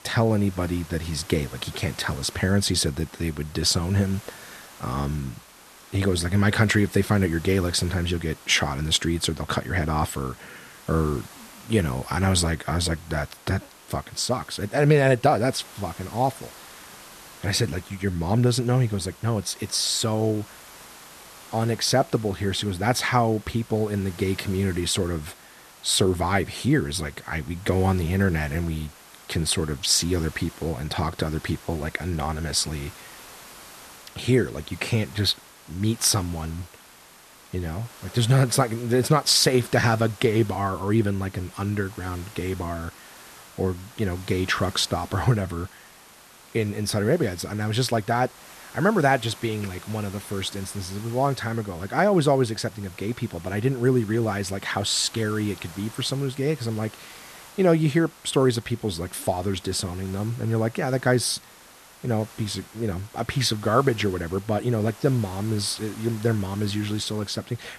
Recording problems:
hiss; faint; throughout; 20 dB below the speech

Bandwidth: 13.5 kHz